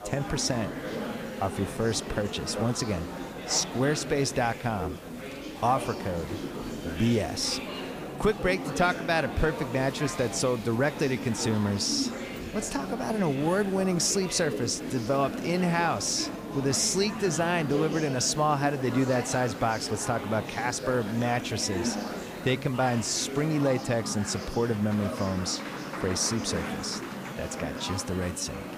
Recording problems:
murmuring crowd; loud; throughout; 7 dB below the speech
hiss; faint; throughout; 25 dB below the speech

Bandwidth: 15 kHz